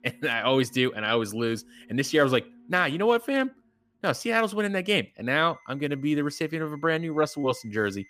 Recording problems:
alarms or sirens; faint; throughout; 30 dB below the speech

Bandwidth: 15 kHz